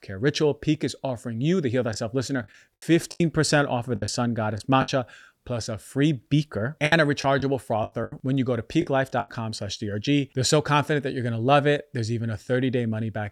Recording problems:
choppy; very; from 2 to 5 s and from 7 to 9.5 s; 11% of the speech affected

